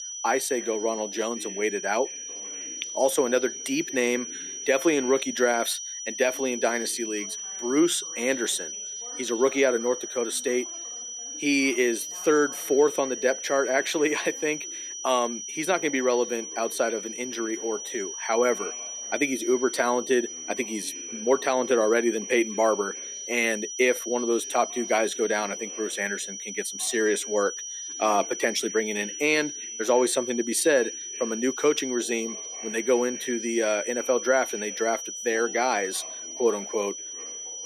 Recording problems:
thin; very slightly; fading below 300 Hz
high-pitched whine; loud; throughout; 6 kHz, 7 dB below the speech
voice in the background; faint; throughout; 25 dB below the speech

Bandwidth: 14.5 kHz